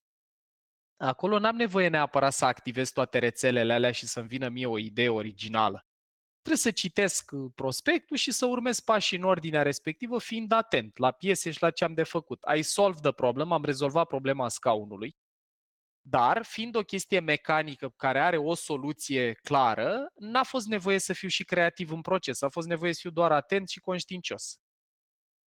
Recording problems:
garbled, watery; slightly; nothing above 17.5 kHz

